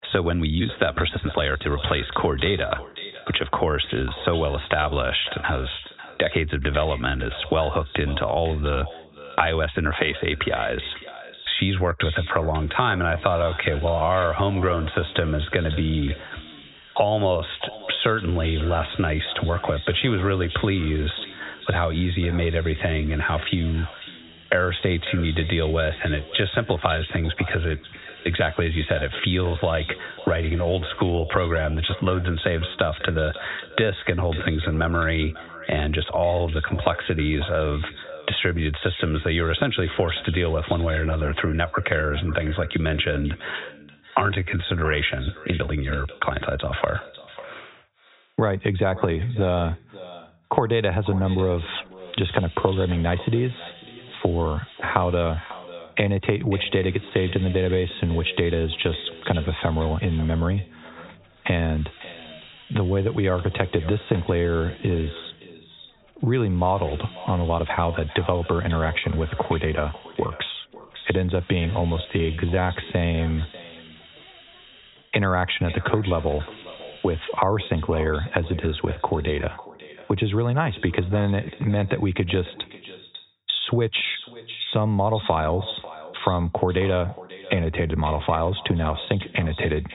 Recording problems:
high frequencies cut off; severe; nothing above 4 kHz
echo of what is said; noticeable; throughout; 550 ms later, 15 dB below the speech
squashed, flat; somewhat
hiss; faint; from 12 to 31 s and from 51 s to 1:17; 20 dB below the speech
uneven, jittery; strongly; from 1 s to 1:13

